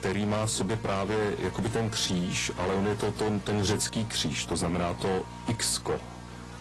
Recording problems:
distortion; heavy; 6 dB below the speech
garbled, watery; slightly
electrical hum; noticeable; throughout; 60 Hz, 15 dB below the speech

